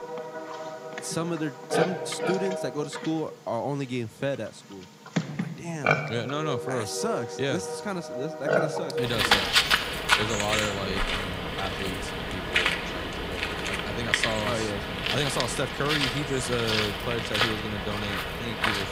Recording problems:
animal sounds; very loud; throughout; 4 dB above the speech

